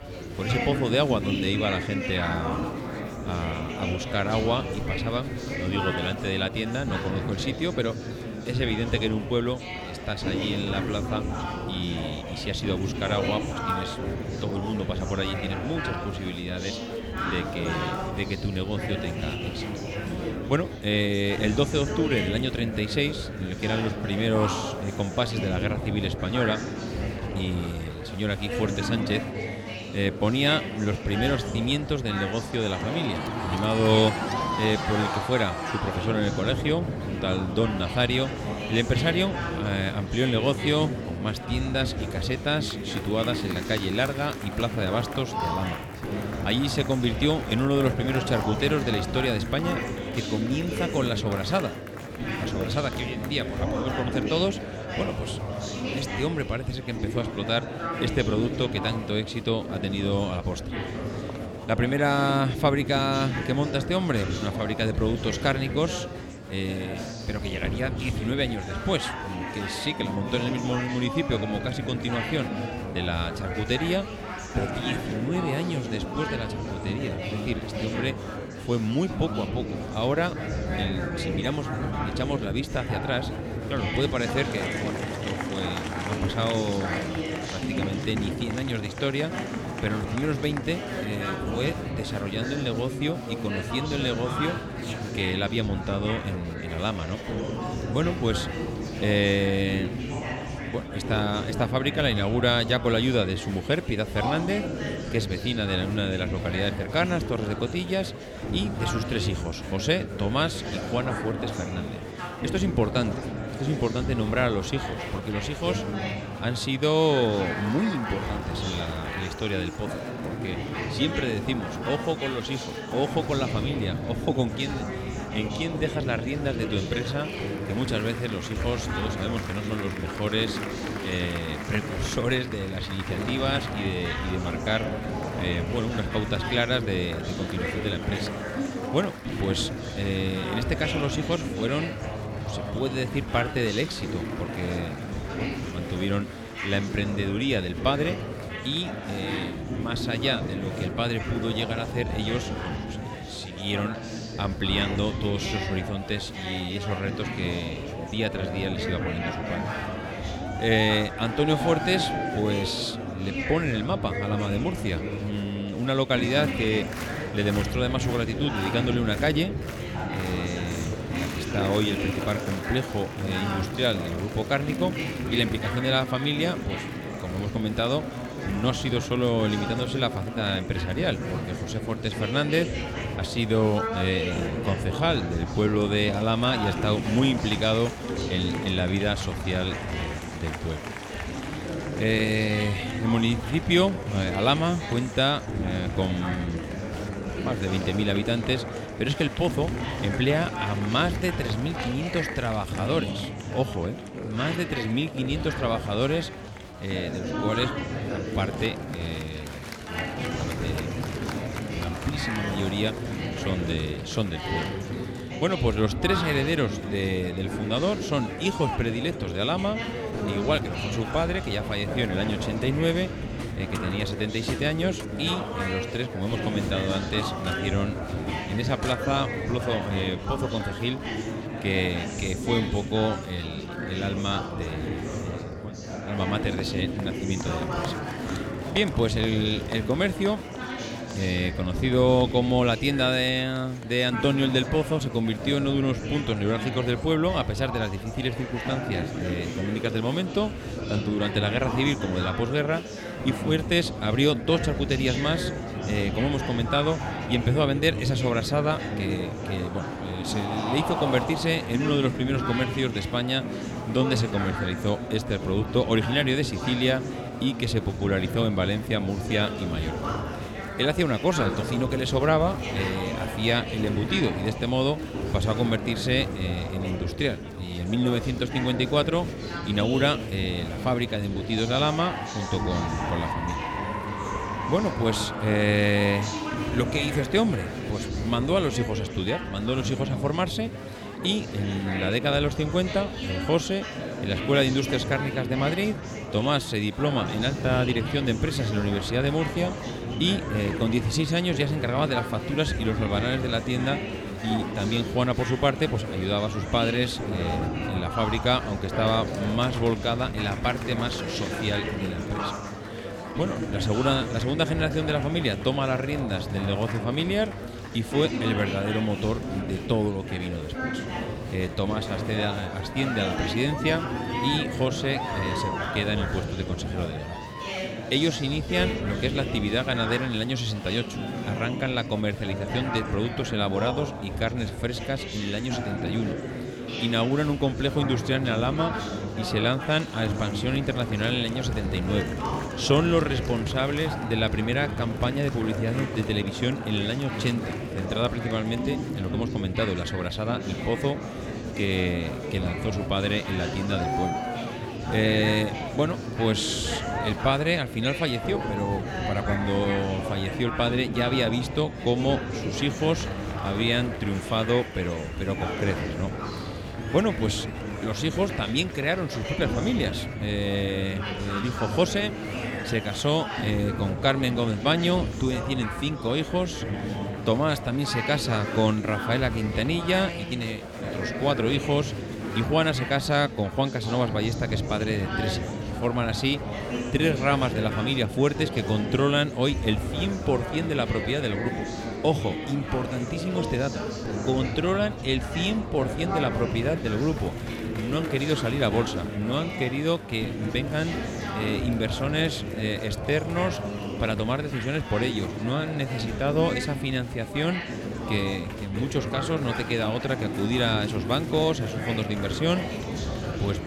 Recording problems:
murmuring crowd; loud; throughout; 4 dB below the speech

